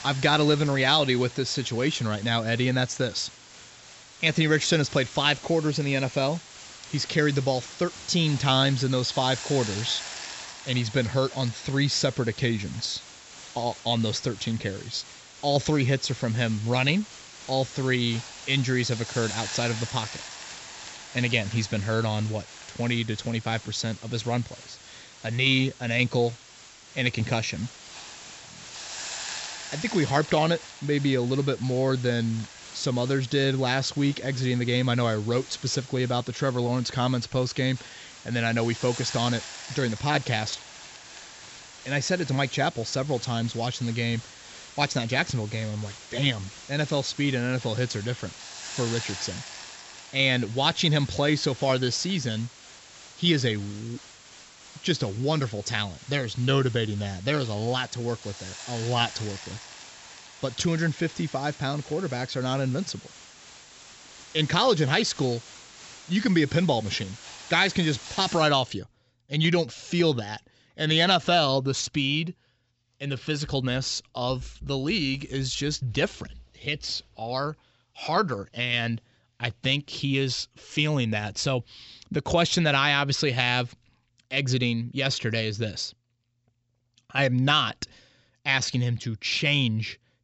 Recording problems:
high frequencies cut off; noticeable; nothing above 7.5 kHz
hiss; noticeable; until 1:08; 15 dB below the speech

